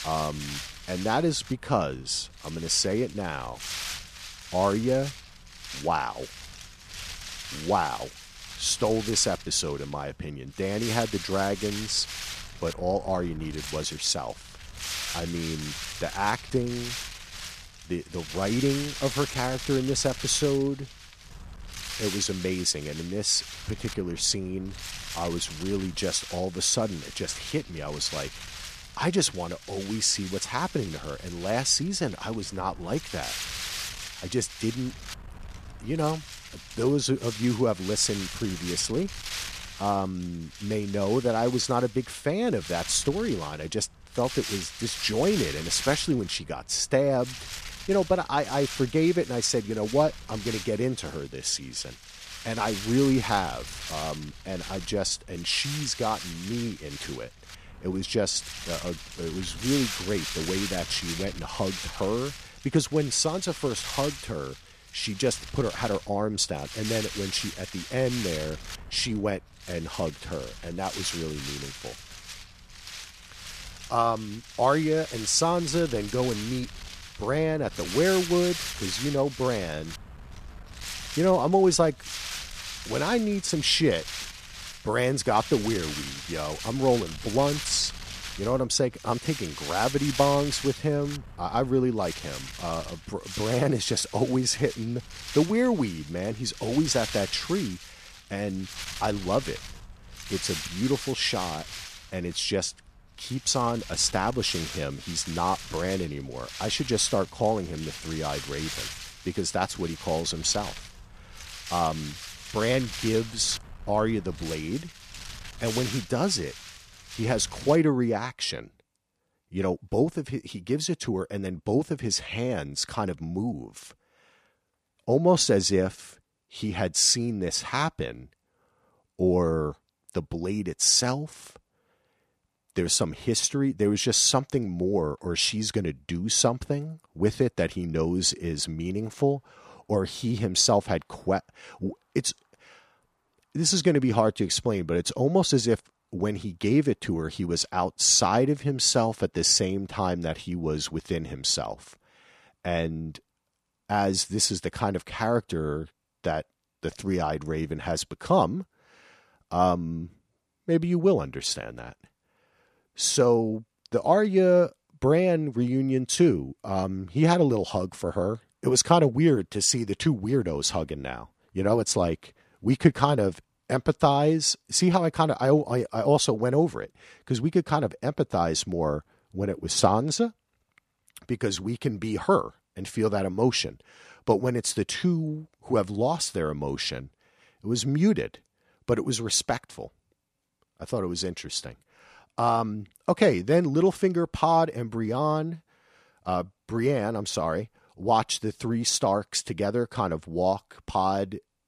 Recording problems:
wind noise on the microphone; heavy; until 1:58; 10 dB below the speech

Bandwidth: 14.5 kHz